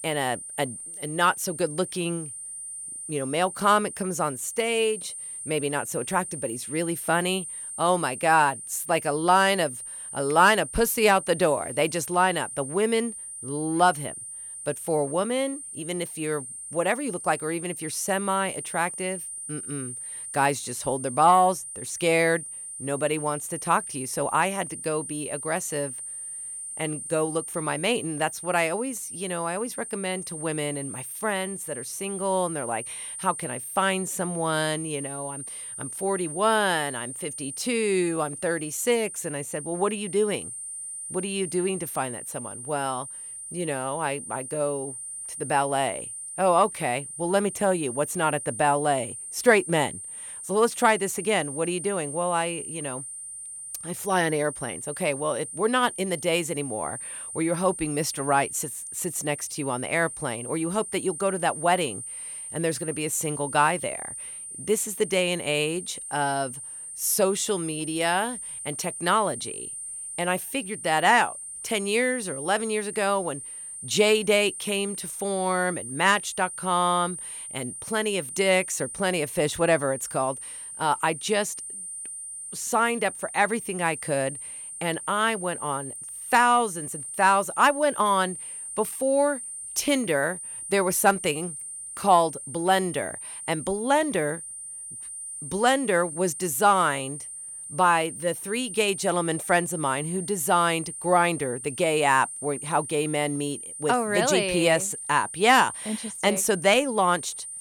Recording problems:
high-pitched whine; loud; throughout; 8.5 kHz, 9 dB below the speech

